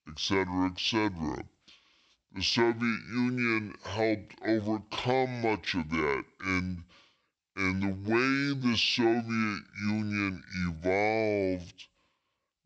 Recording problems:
wrong speed and pitch; too slow and too low; 0.6 times normal speed

